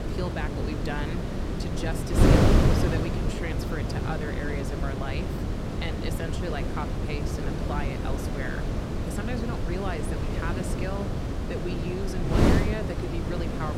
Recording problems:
wind noise on the microphone; heavy; 3 dB above the speech

